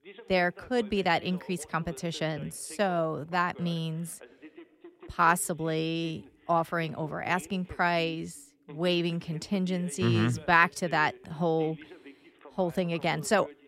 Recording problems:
voice in the background; faint; throughout; 20 dB below the speech

